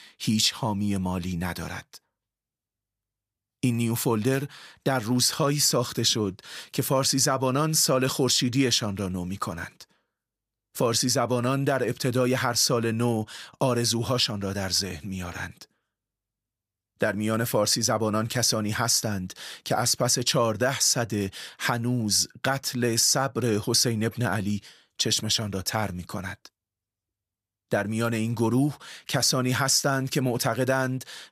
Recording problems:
none

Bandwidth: 15 kHz